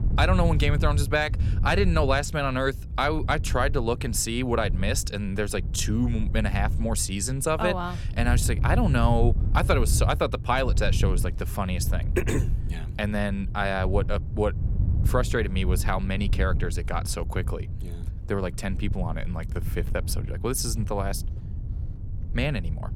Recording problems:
wind noise on the microphone; occasional gusts; 15 dB below the speech

